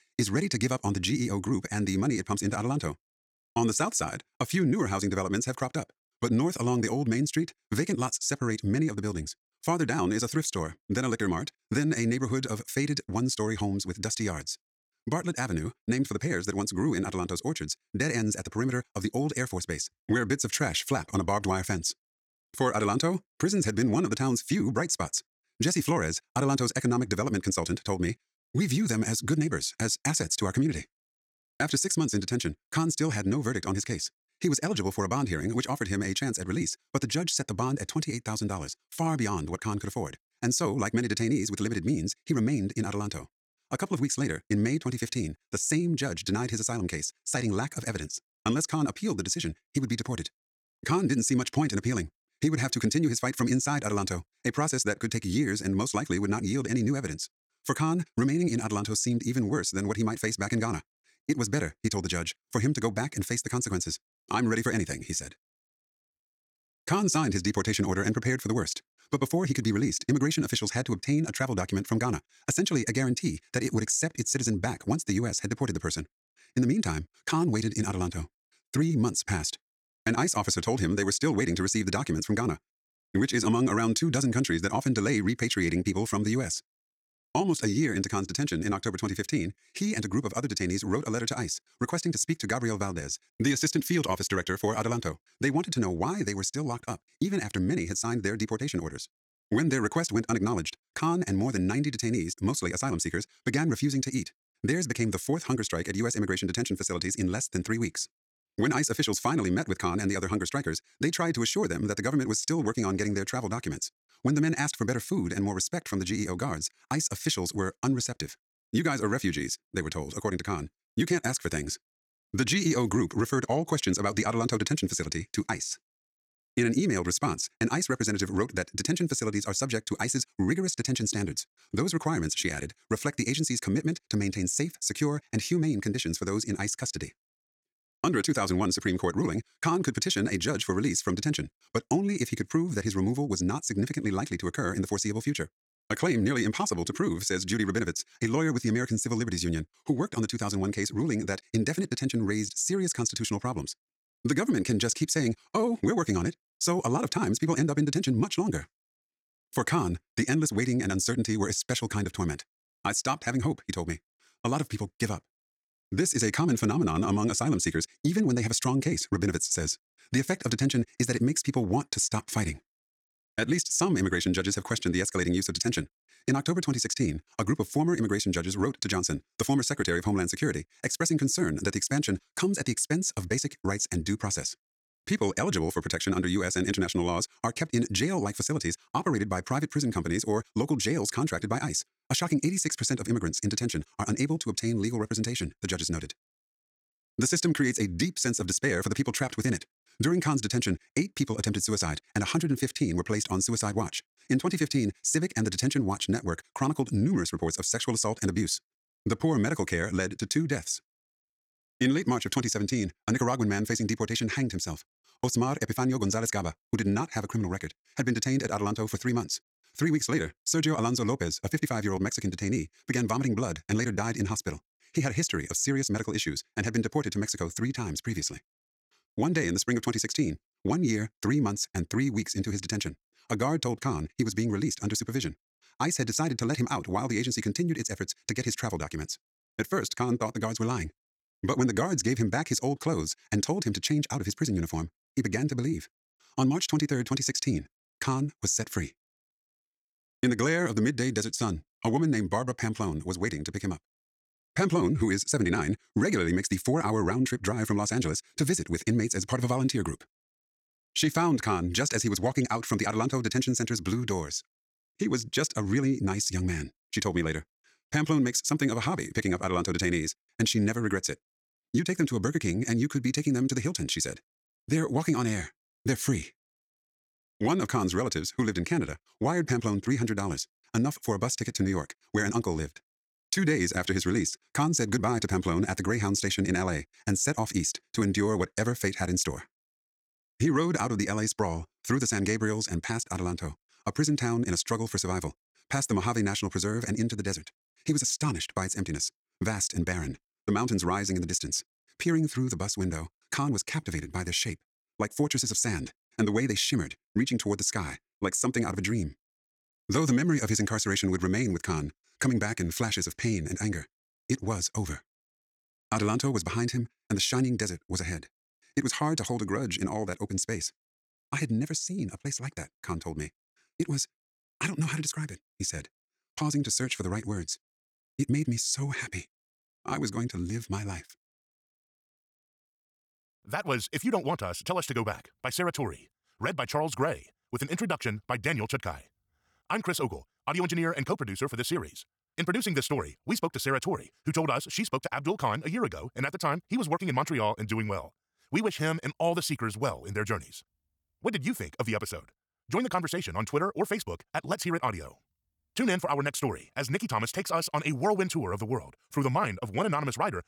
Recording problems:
wrong speed, natural pitch; too fast; 1.8 times normal speed

